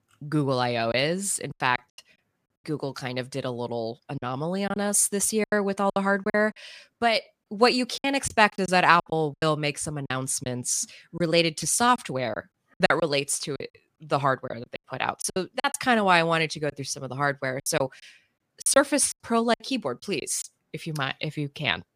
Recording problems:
choppy; very; 9% of the speech affected

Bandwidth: 15 kHz